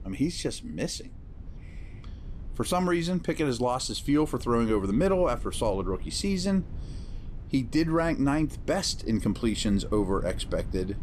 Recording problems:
low rumble; faint; throughout; 25 dB below the speech

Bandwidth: 14.5 kHz